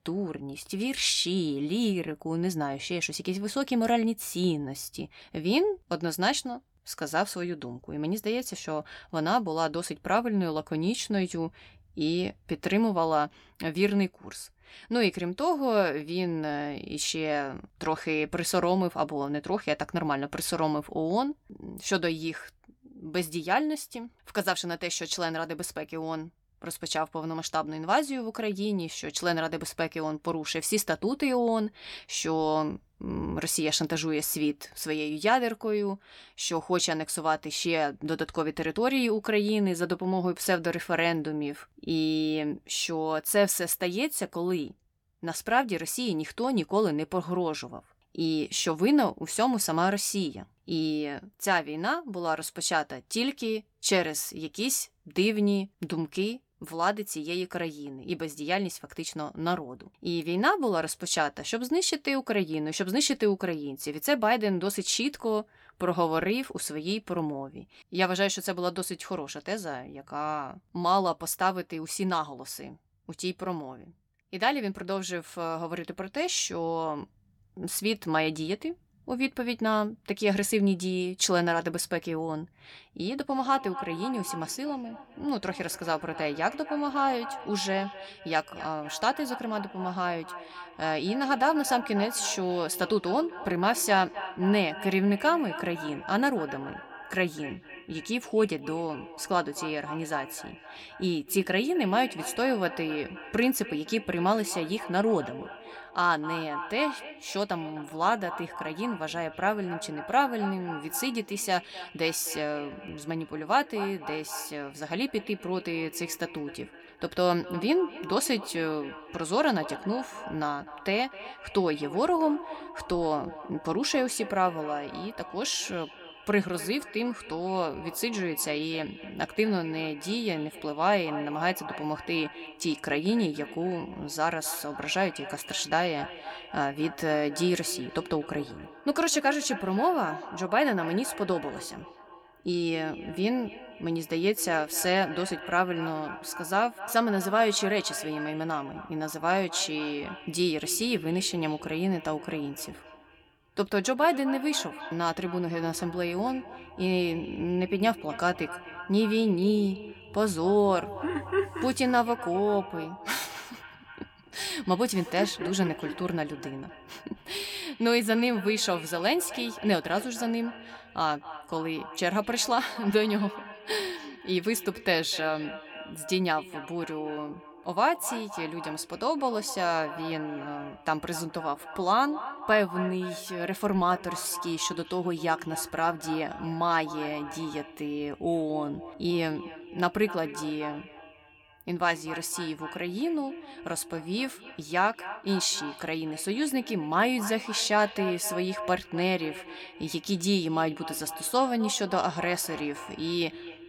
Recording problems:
echo of what is said; noticeable; from 1:23 on; 250 ms later, 15 dB below the speech

